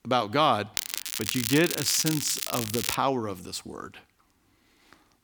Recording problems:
crackling; loud; from 1 to 3 s; 3 dB below the speech

